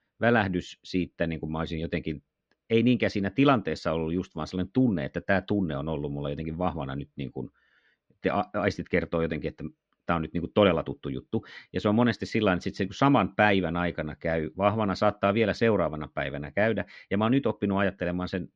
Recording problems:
muffled; slightly; fading above 4 kHz

